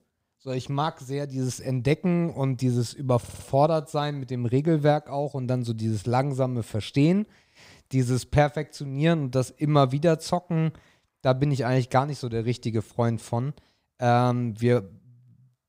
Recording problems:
audio stuttering; at 3 s

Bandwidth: 15.5 kHz